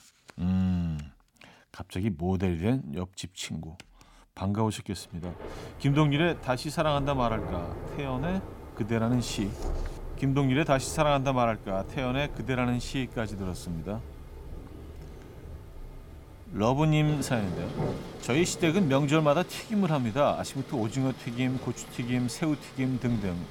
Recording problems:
rain or running water; noticeable; from 5.5 s on; 10 dB below the speech

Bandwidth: 17 kHz